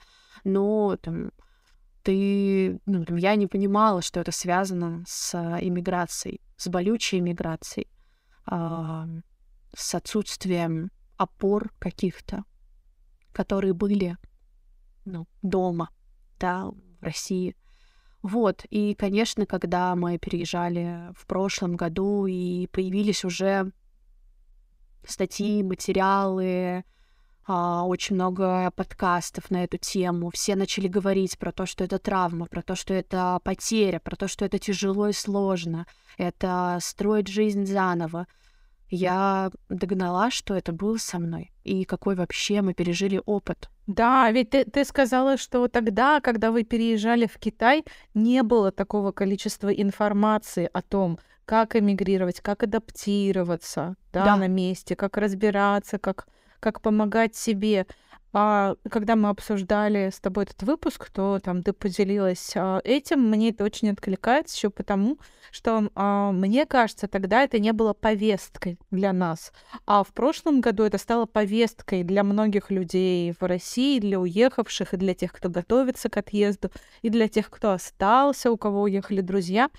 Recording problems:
none

